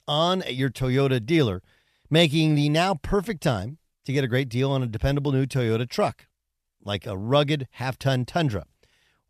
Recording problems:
none

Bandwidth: 14 kHz